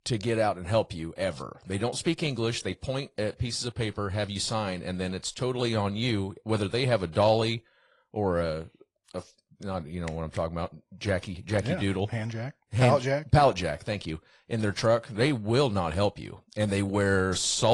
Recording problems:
garbled, watery; slightly
abrupt cut into speech; at the end

